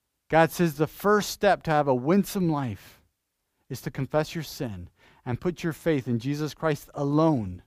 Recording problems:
none

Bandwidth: 15 kHz